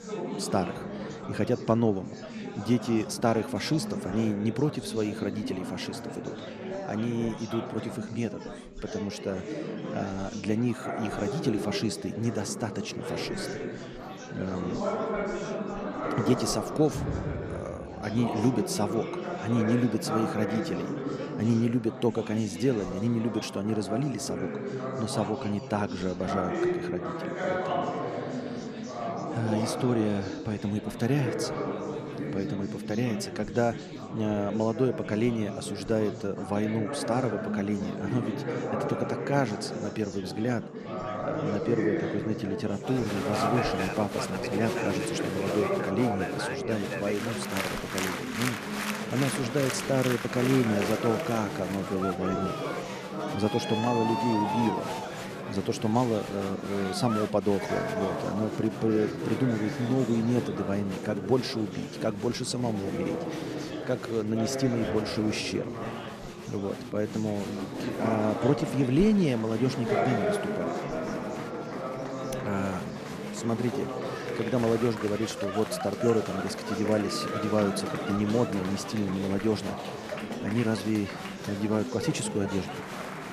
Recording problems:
chatter from many people; loud; throughout; 4 dB below the speech

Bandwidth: 14.5 kHz